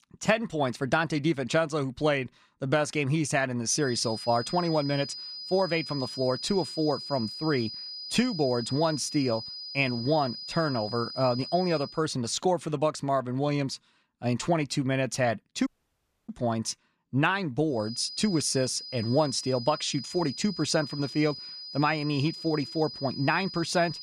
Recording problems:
high-pitched whine; loud; from 4 to 12 s and from 18 s on; 5 kHz, 9 dB below the speech
audio cutting out; at 16 s for 0.5 s

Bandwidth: 14.5 kHz